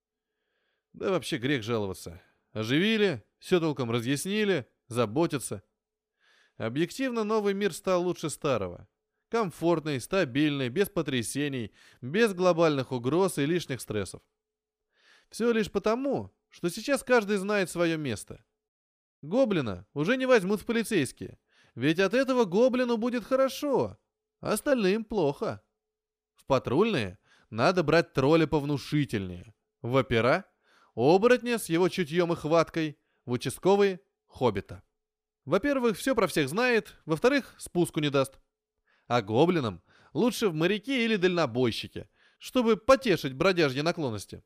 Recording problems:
none

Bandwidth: 15 kHz